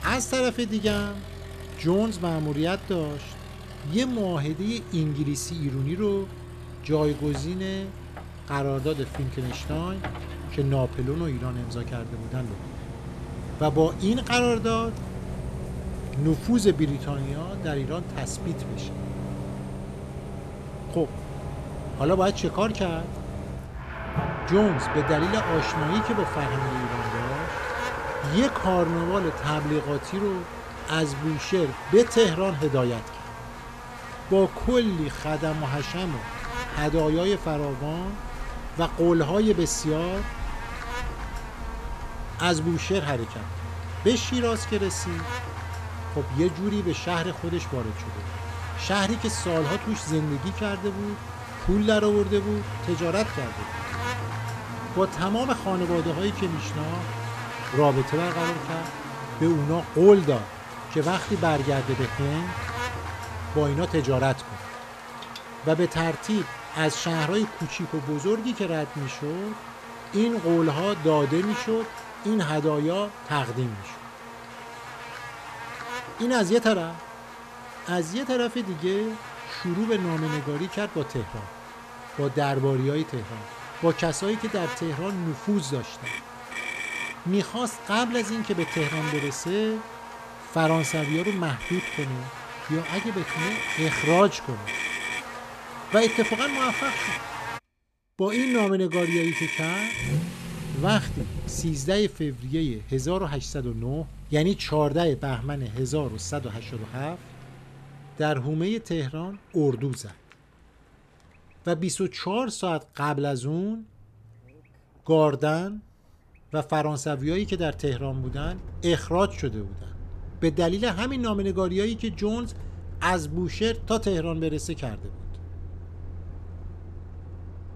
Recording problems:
electrical hum; loud; from 25 s to 1:38; 50 Hz, 8 dB below the speech
traffic noise; loud; throughout; 9 dB below the speech

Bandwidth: 14.5 kHz